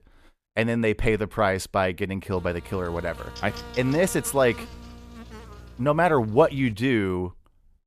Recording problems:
electrical hum; noticeable; from 2.5 to 6.5 s; 60 Hz, 15 dB below the speech

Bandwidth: 14.5 kHz